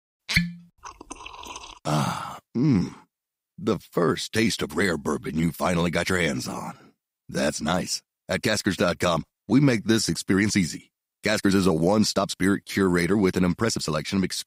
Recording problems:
uneven, jittery; strongly; from 1 to 14 s

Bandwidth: 15.5 kHz